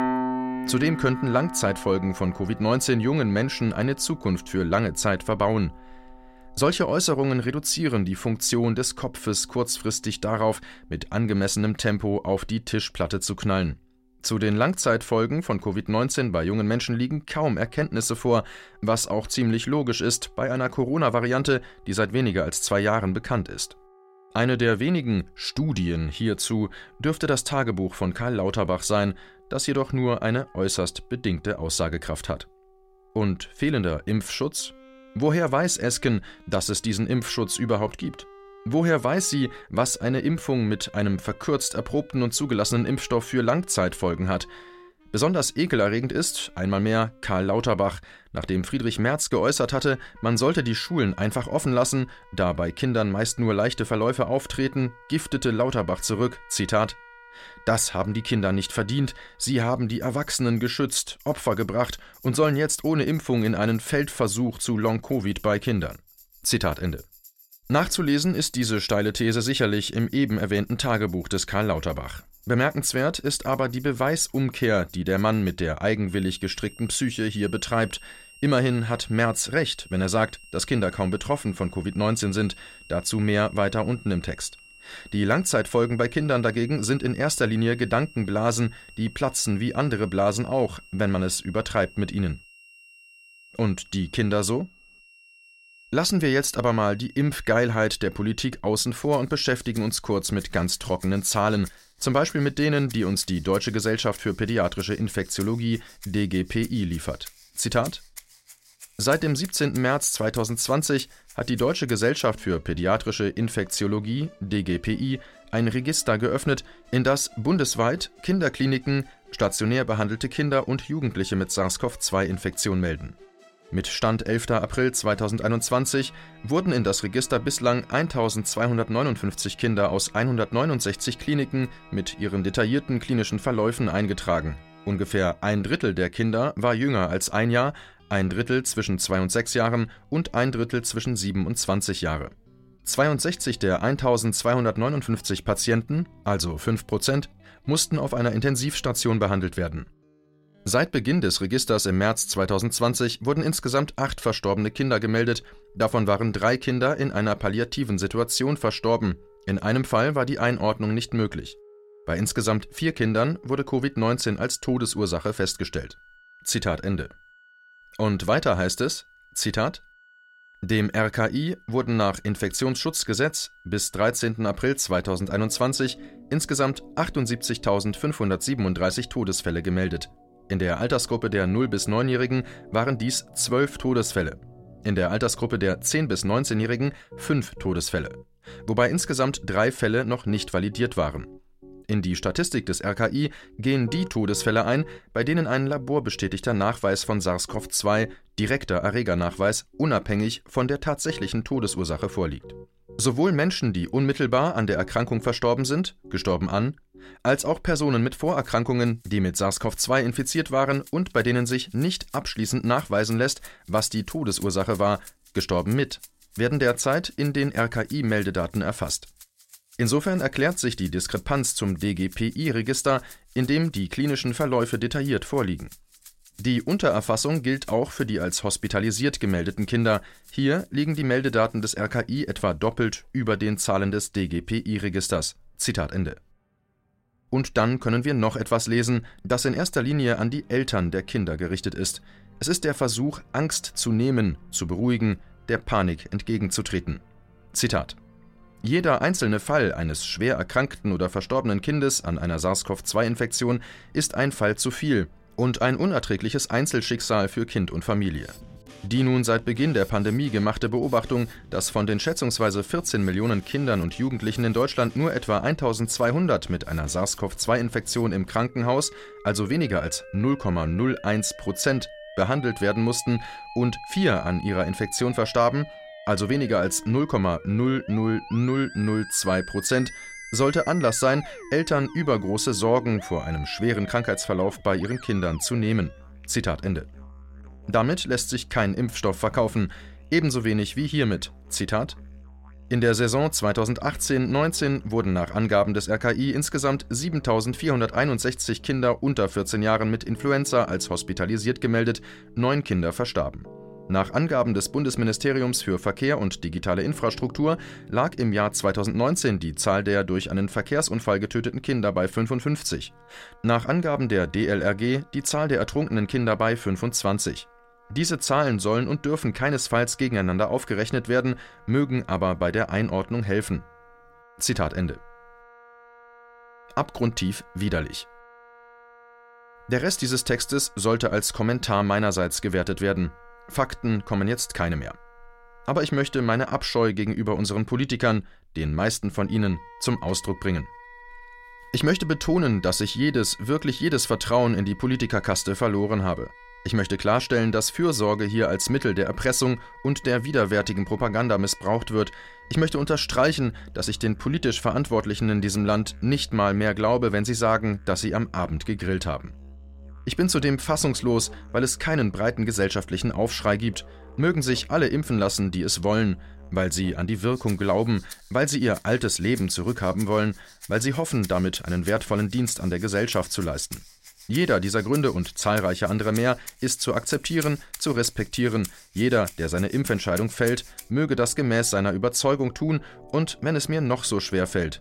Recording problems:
background music; faint; throughout; 20 dB below the speech

